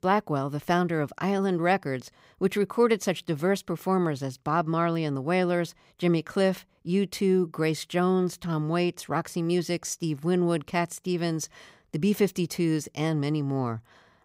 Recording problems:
none

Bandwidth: 15.5 kHz